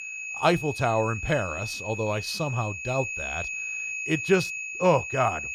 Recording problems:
high-pitched whine; loud; throughout; 2.5 kHz, 5 dB below the speech

